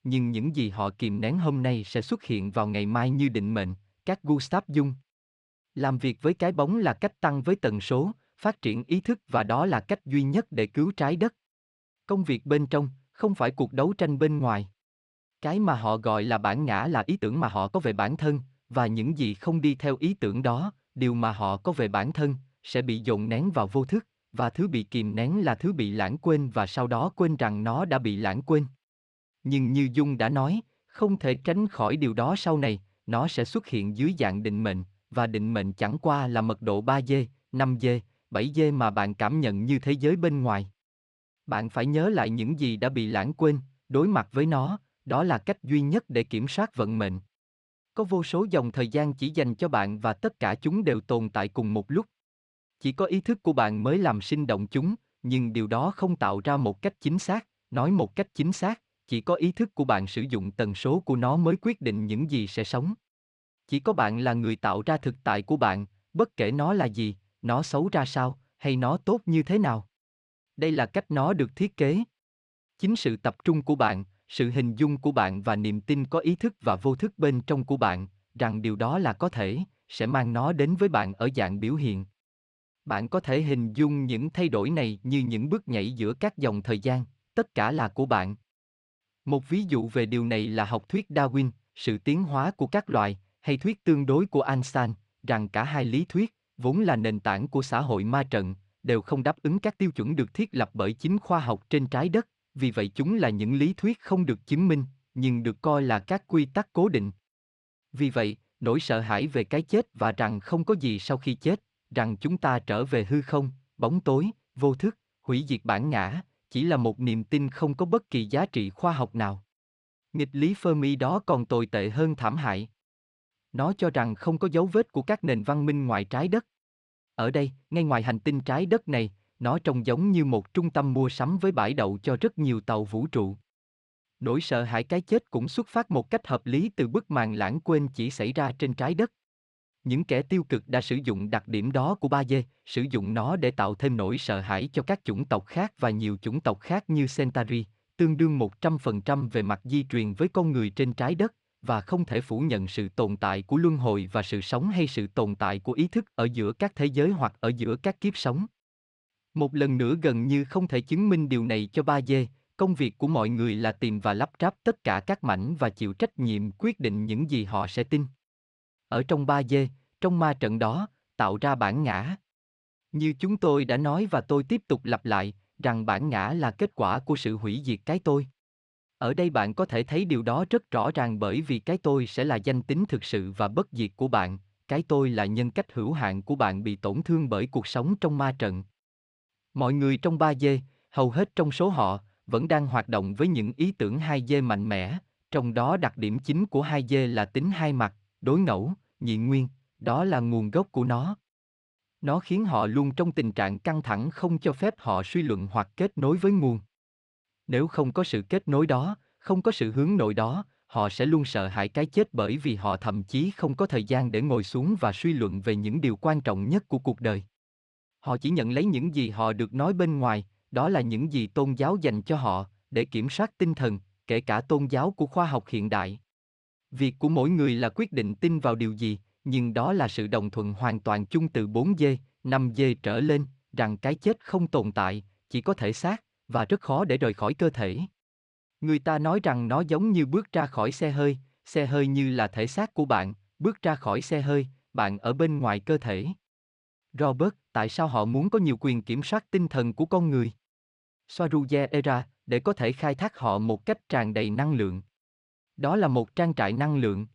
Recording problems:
uneven, jittery; strongly; from 17 s to 4:14

